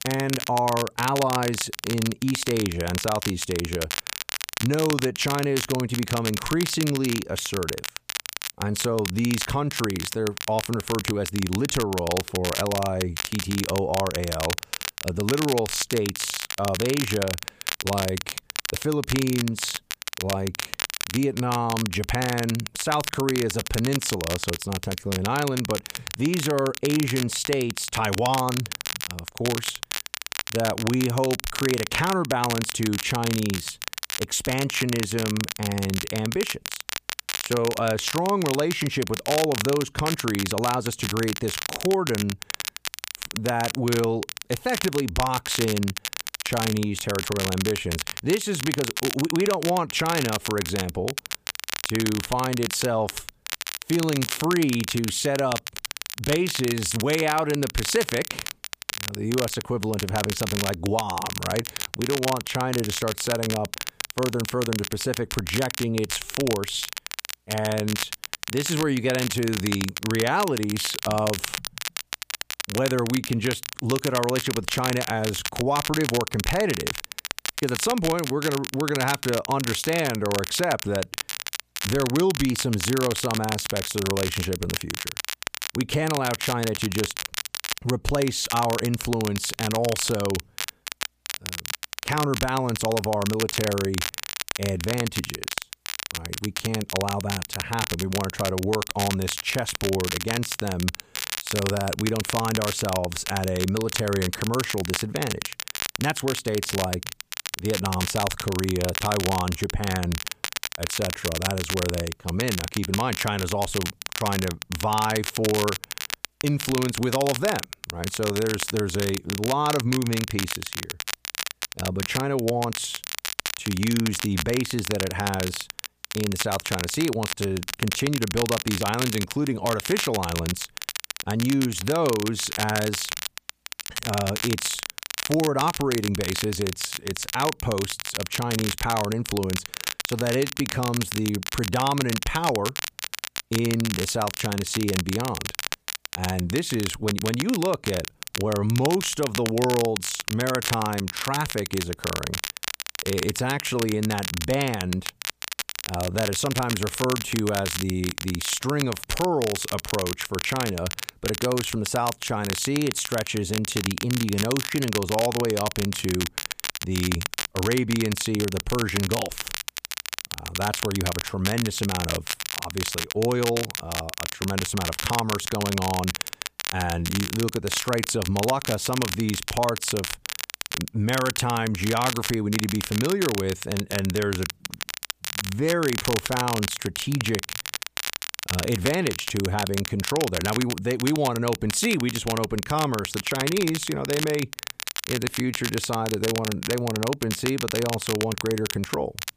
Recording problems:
crackle, like an old record; loud; 4 dB below the speech

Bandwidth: 15 kHz